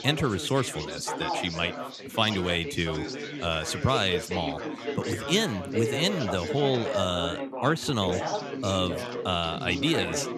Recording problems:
background chatter; loud; throughout; 4 voices, 5 dB below the speech

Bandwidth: 13.5 kHz